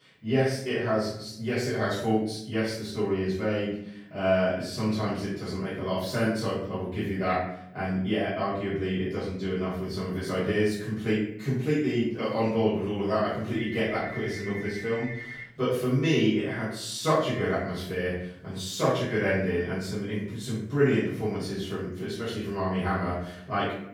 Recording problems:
off-mic speech; far
room echo; noticeable; dies away in 0.6 s
phone ringing; noticeable; from 14 to 16 s; peak 10 dB below the speech

